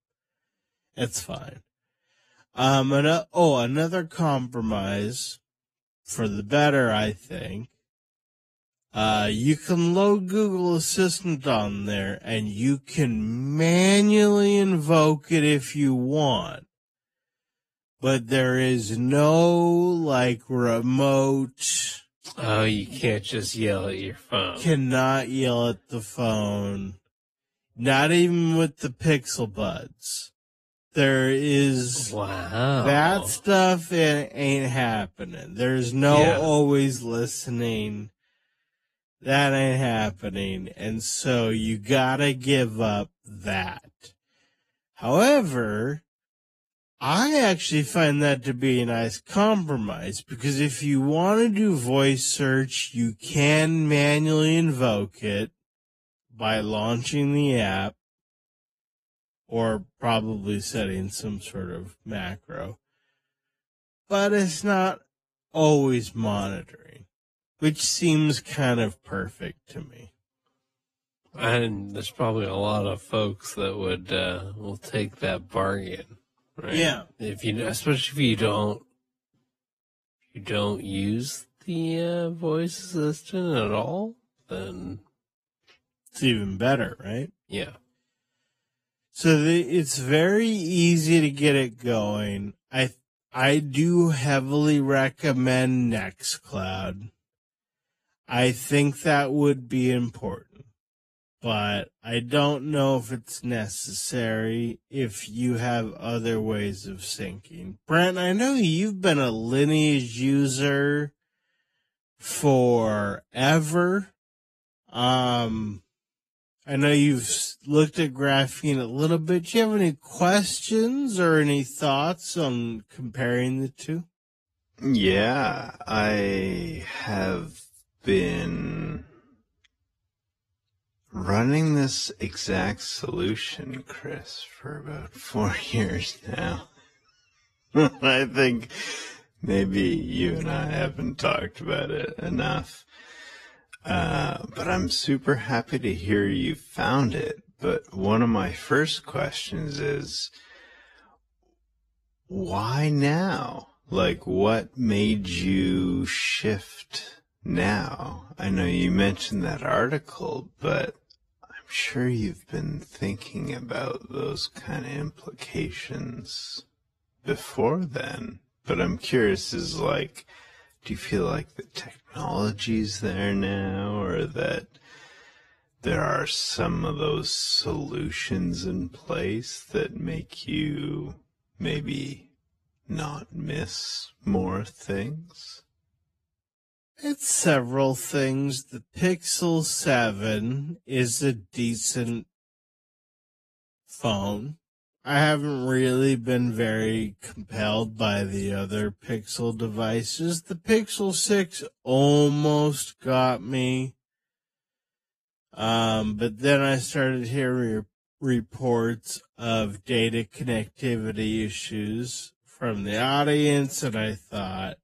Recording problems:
wrong speed, natural pitch; too slow; 0.5 times normal speed
garbled, watery; slightly; nothing above 12.5 kHz

